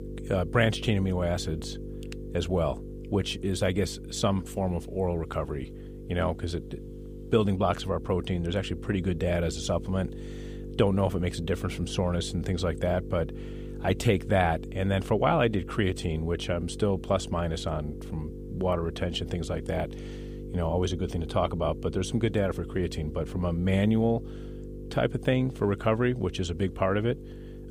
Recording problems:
electrical hum; noticeable; throughout; 50 Hz, 15 dB below the speech

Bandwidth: 15 kHz